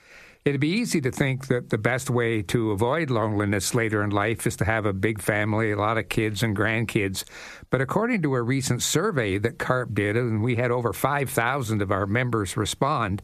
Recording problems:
squashed, flat; somewhat

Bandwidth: 14.5 kHz